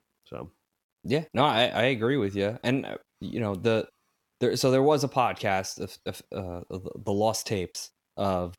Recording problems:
none

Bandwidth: 17.5 kHz